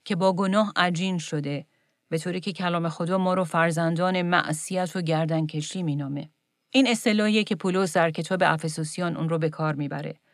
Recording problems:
none

